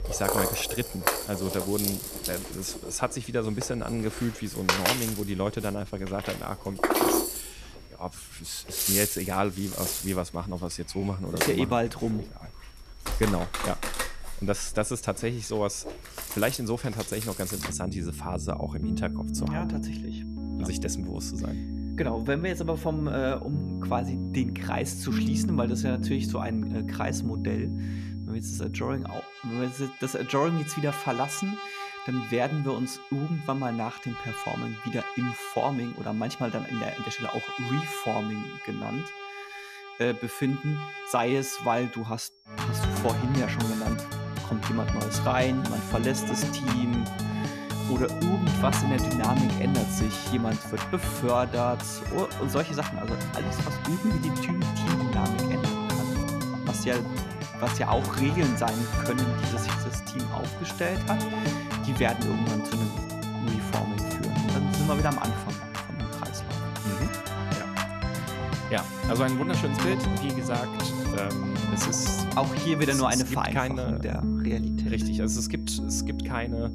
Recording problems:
background music; loud; throughout; as loud as the speech
high-pitched whine; faint; throughout; 5.5 kHz, 25 dB below the speech

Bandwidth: 14.5 kHz